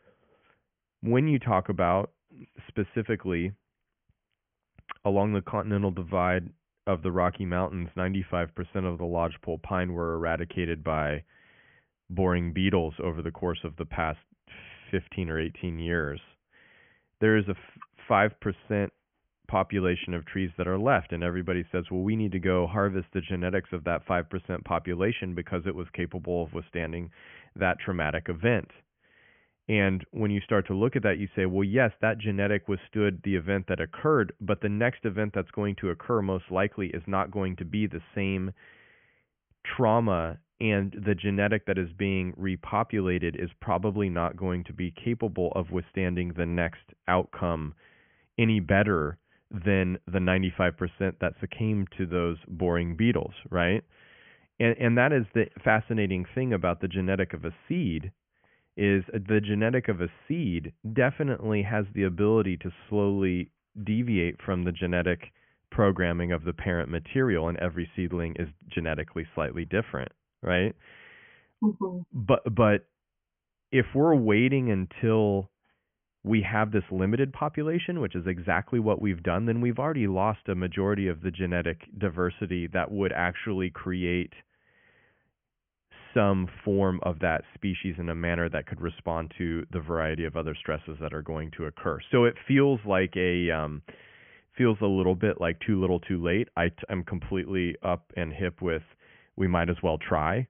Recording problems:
high frequencies cut off; severe; nothing above 3 kHz

